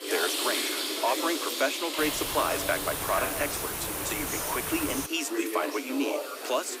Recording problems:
thin; somewhat; fading below 300 Hz
household noises; loud; throughout; 3 dB below the speech
background chatter; loud; throughout; 4 voices, 6 dB below the speech
hiss; loud; from 2 to 5 s; 1 dB below the speech

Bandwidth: 15.5 kHz